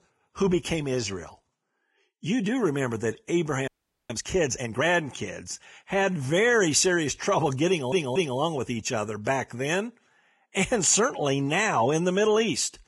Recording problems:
garbled, watery; badly; nothing above 10.5 kHz
audio freezing; at 3.5 s
audio stuttering; at 7.5 s

